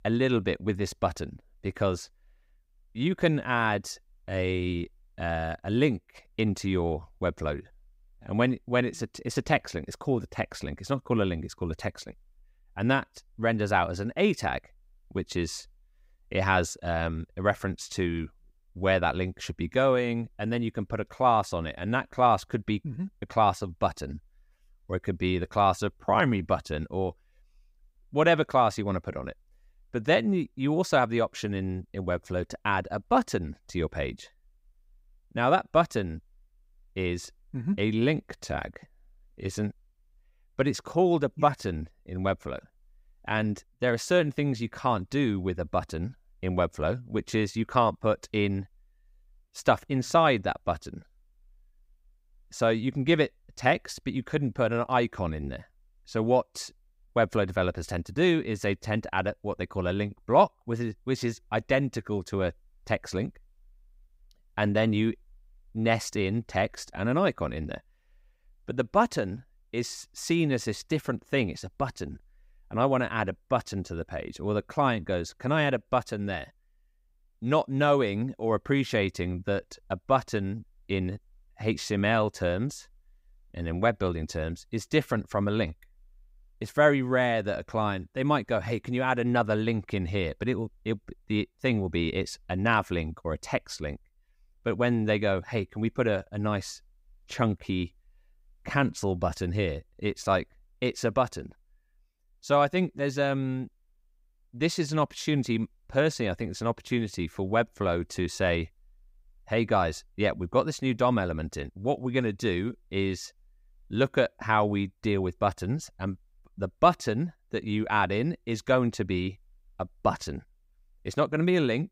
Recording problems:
none

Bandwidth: 15.5 kHz